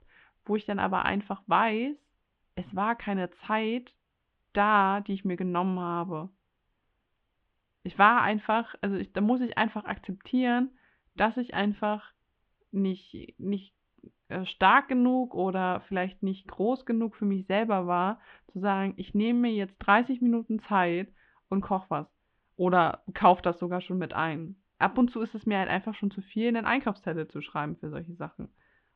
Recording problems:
muffled; very; fading above 3 kHz

